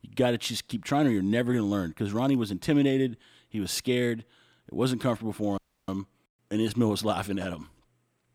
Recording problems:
audio cutting out; at 5.5 s

